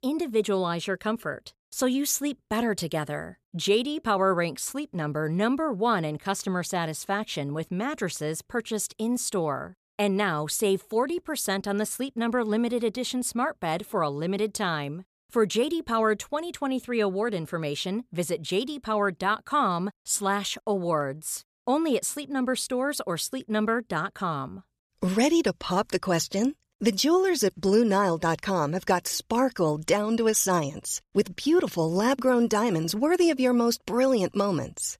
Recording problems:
none

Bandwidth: 14.5 kHz